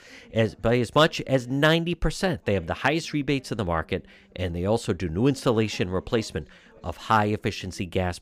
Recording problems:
voice in the background; faint; throughout; 30 dB below the speech

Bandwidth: 15 kHz